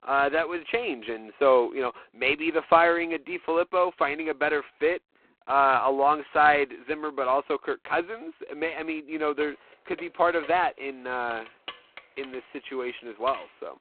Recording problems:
phone-call audio; poor line; nothing above 4 kHz
jangling keys; faint; from 9.5 s on; peak 15 dB below the speech

